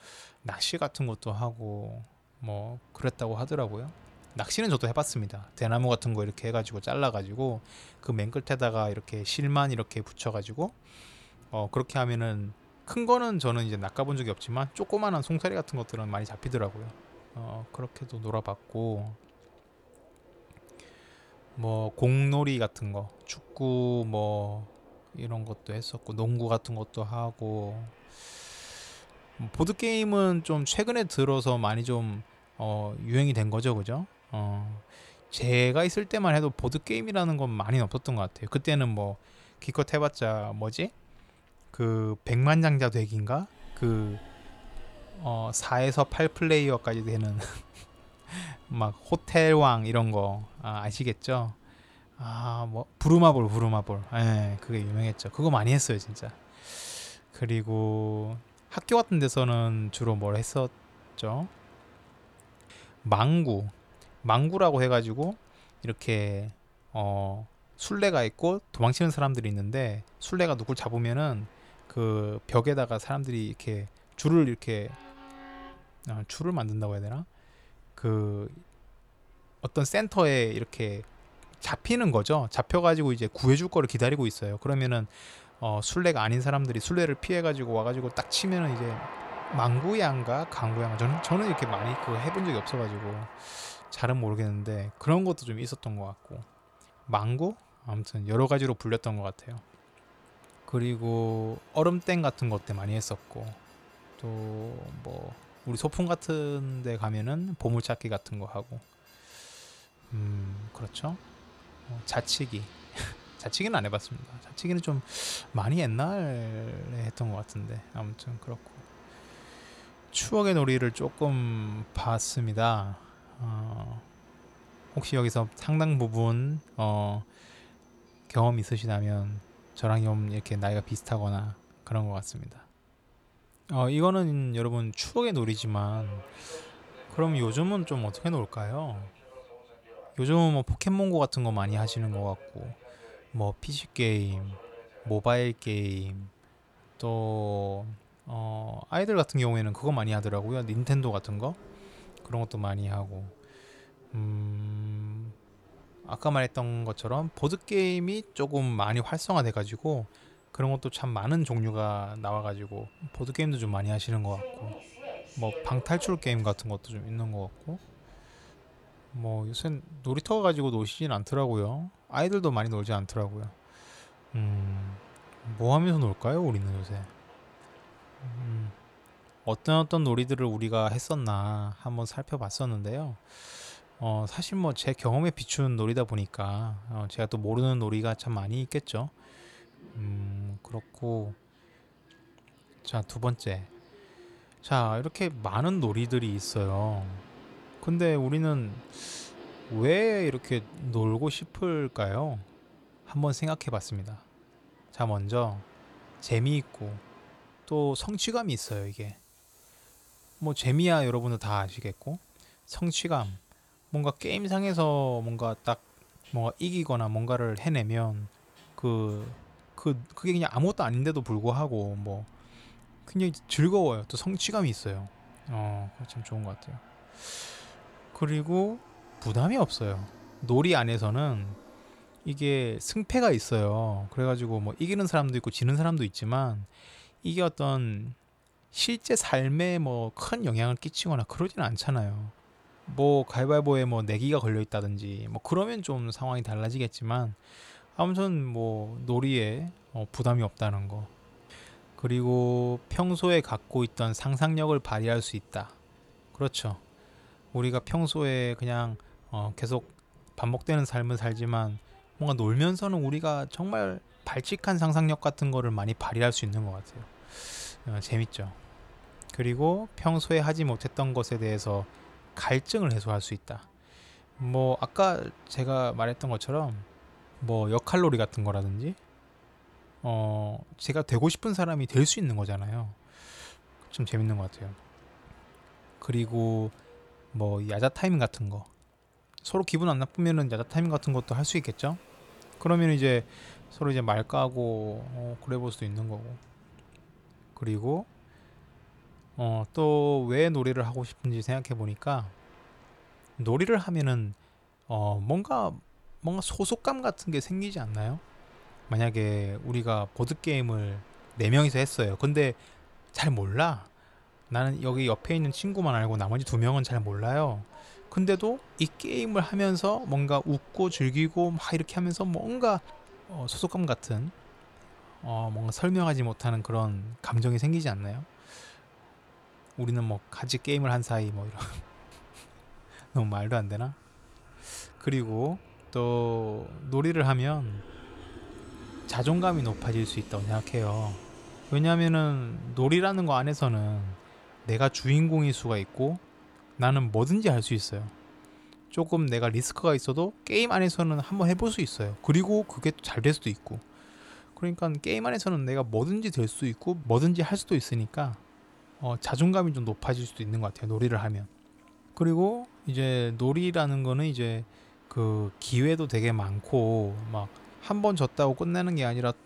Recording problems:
train or aircraft noise; faint; throughout; 25 dB below the speech

